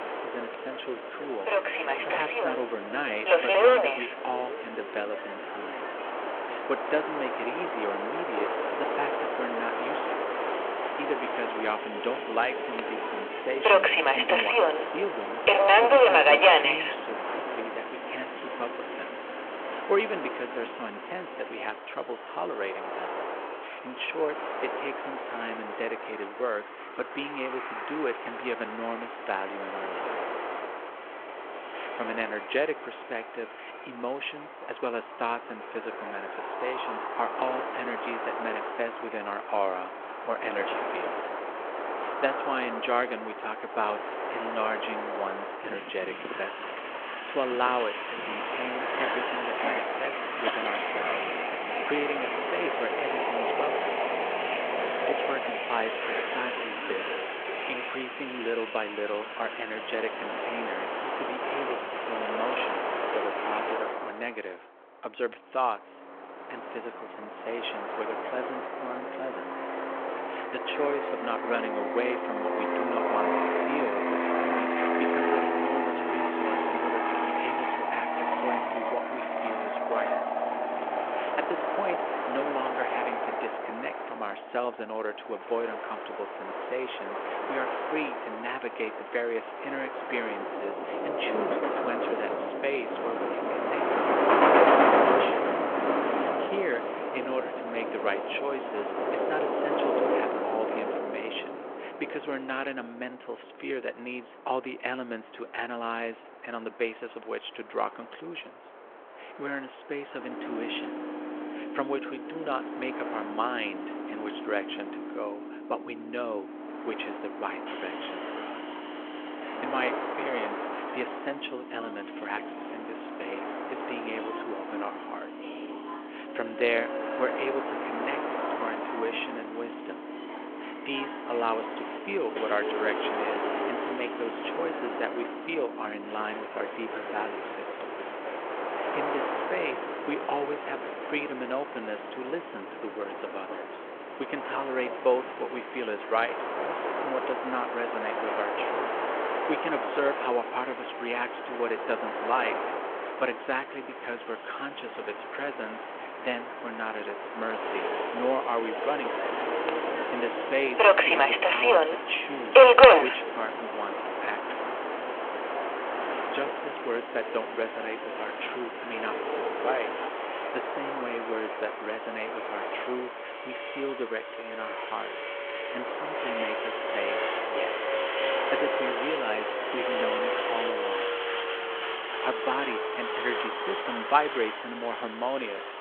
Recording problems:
phone-call audio
train or aircraft noise; very loud; throughout; 5 dB above the speech

